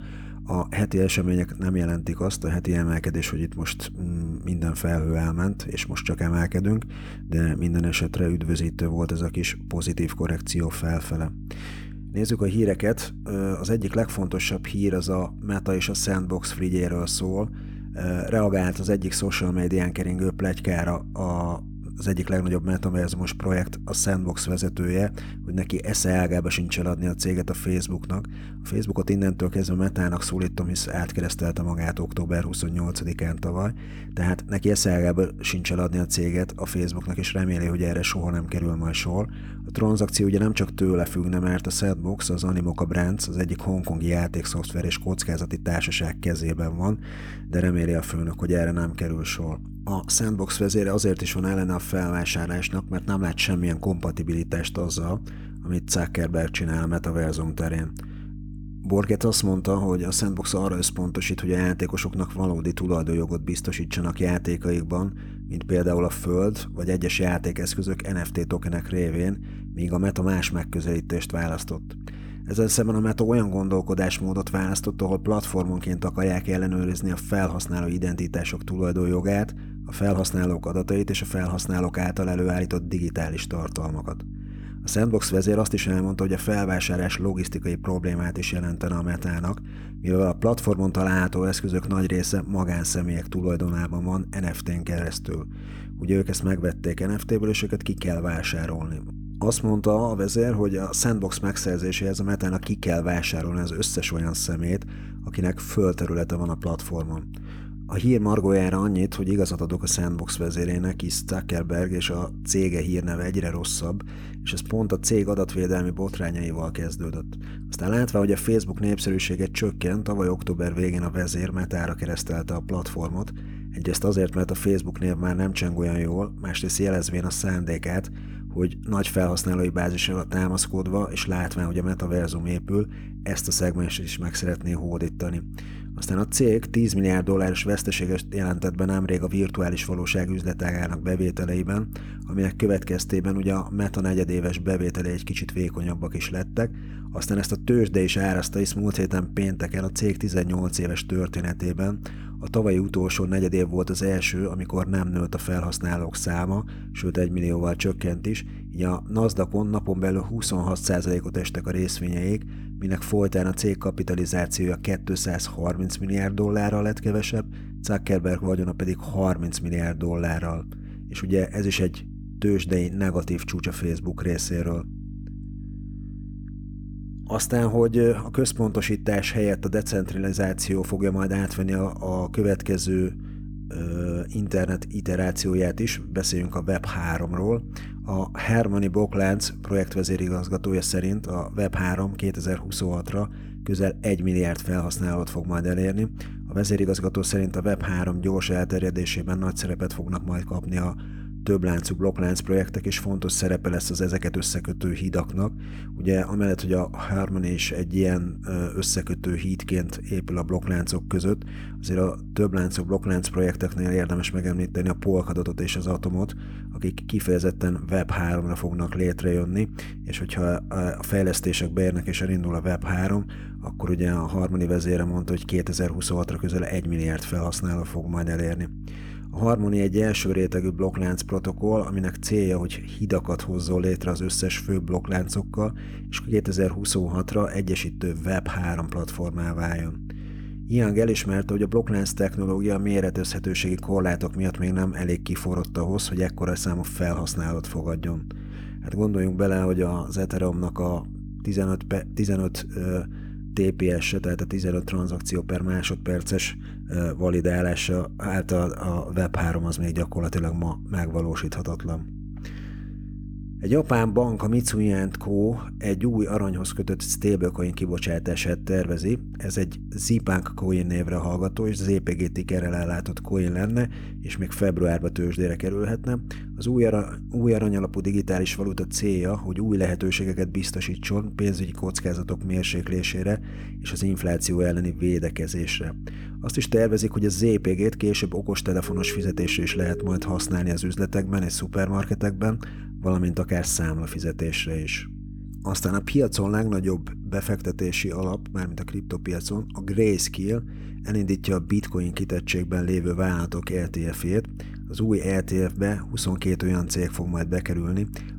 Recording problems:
electrical hum; noticeable; throughout; 50 Hz, 20 dB below the speech
siren; noticeable; from 4:49 to 4:51; peak 8 dB below the speech

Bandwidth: 18.5 kHz